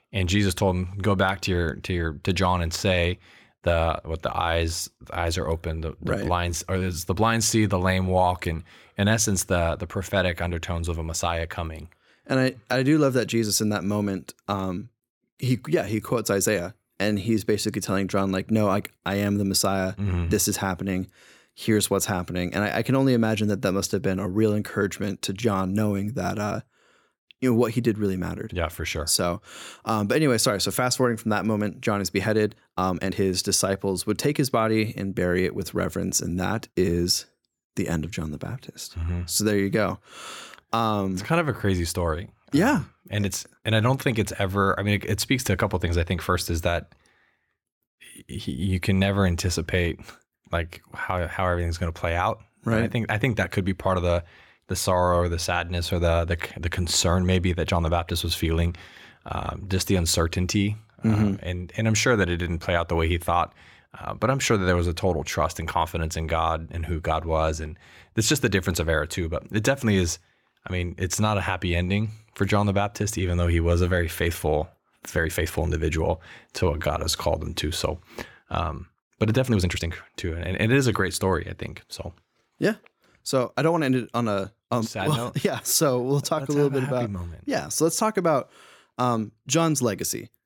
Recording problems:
uneven, jittery; strongly; from 6 s to 1:24

